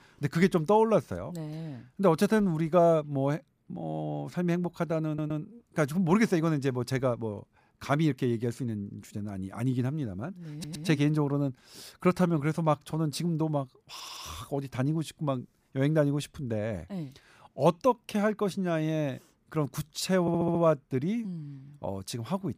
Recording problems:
audio stuttering; 4 times, first at 5 s

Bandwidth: 15 kHz